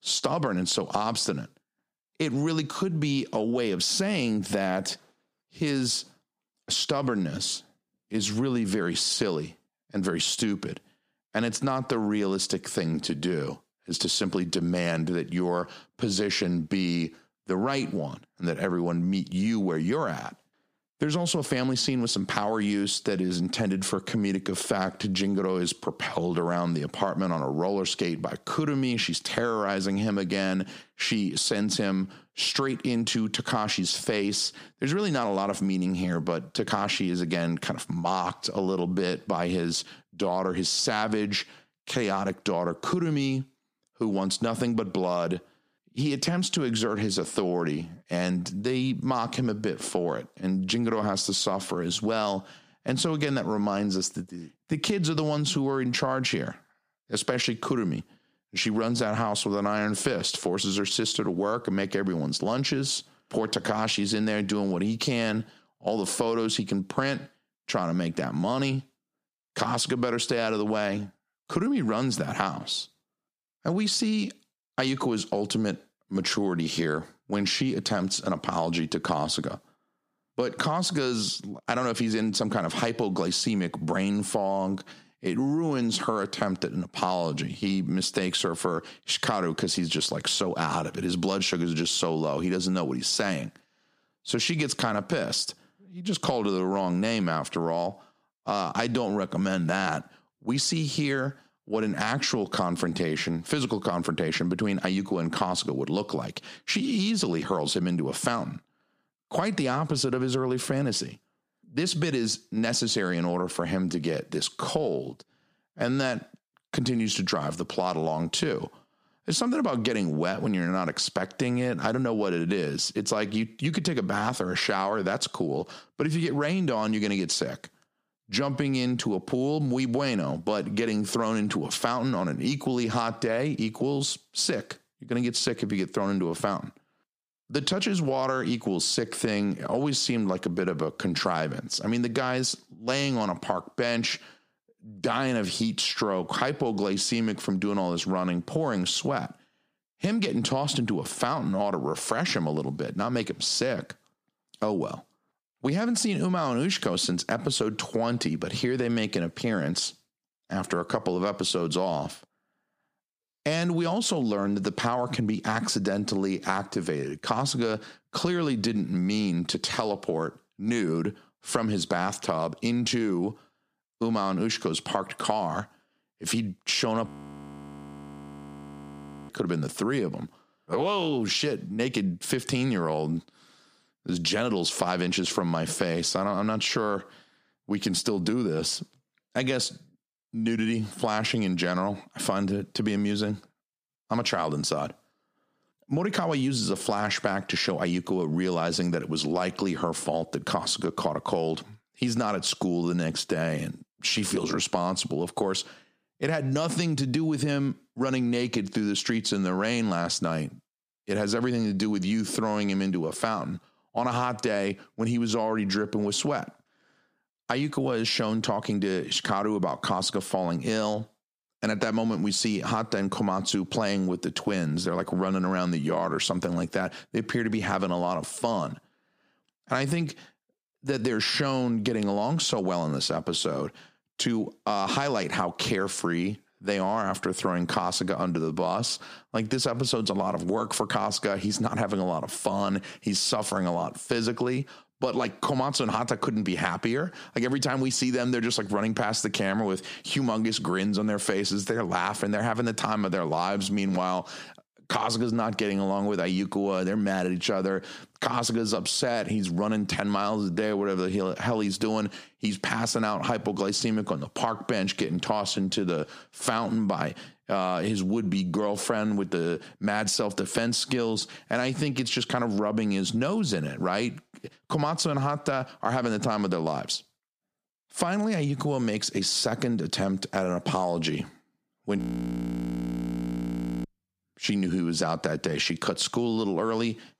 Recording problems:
squashed, flat; heavily
audio freezing; at 2:57 for 2 s and at 4:42 for 2 s

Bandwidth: 14.5 kHz